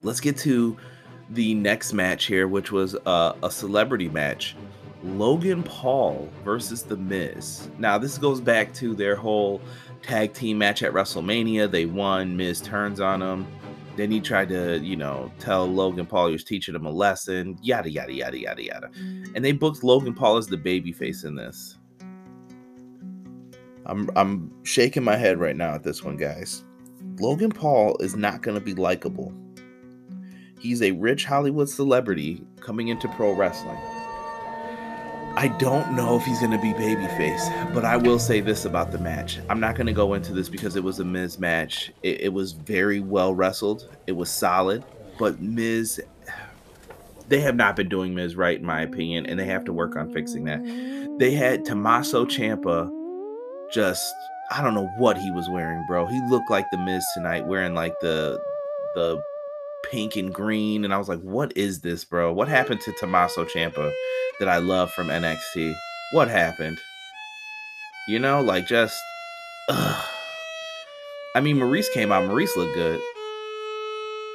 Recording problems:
background music; noticeable; throughout; 10 dB below the speech

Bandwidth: 14.5 kHz